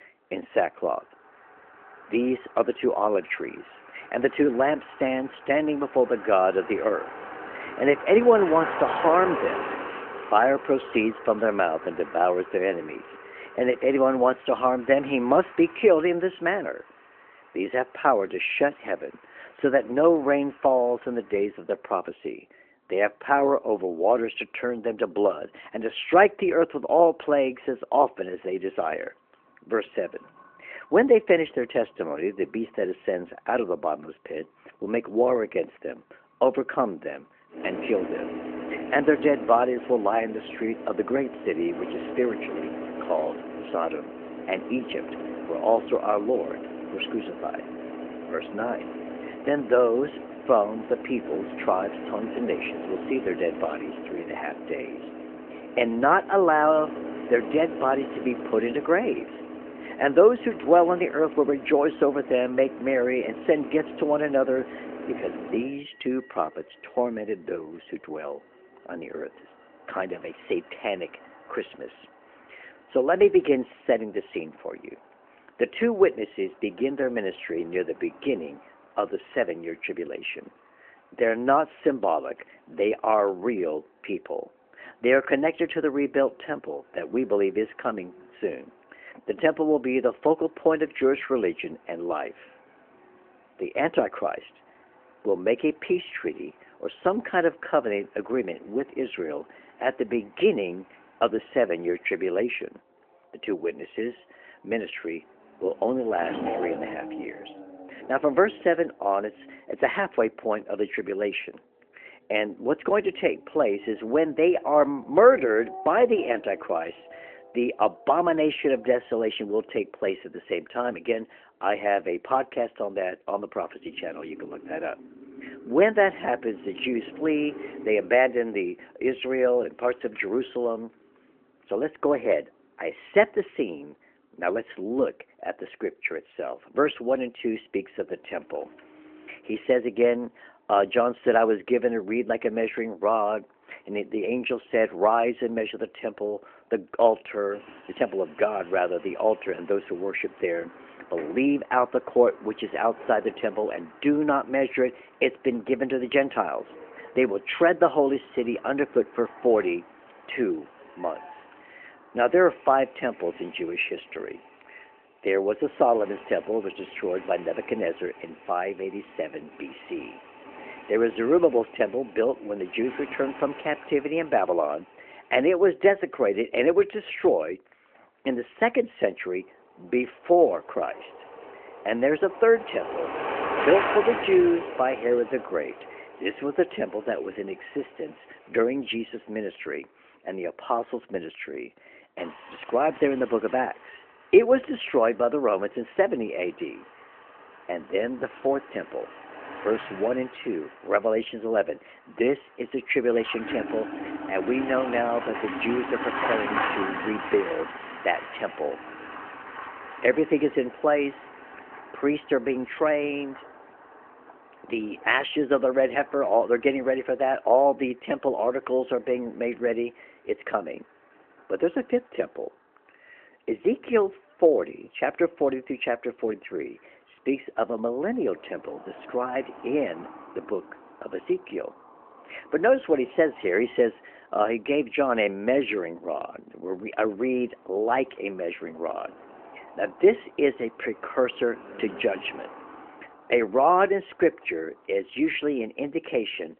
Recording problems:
phone-call audio
traffic noise; noticeable; throughout; 10 dB below the speech

